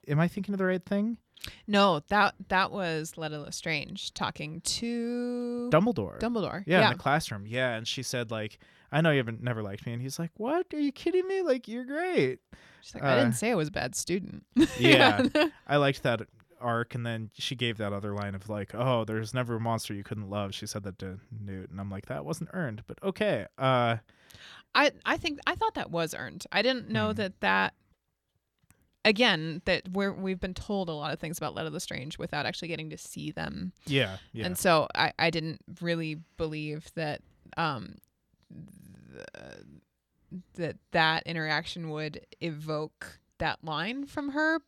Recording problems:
none

